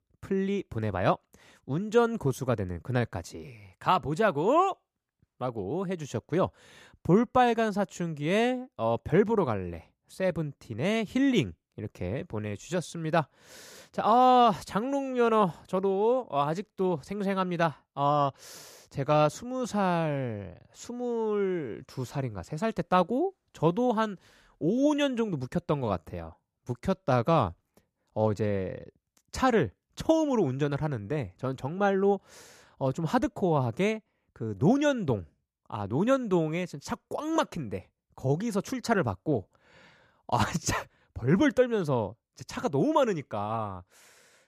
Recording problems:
none

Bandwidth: 14.5 kHz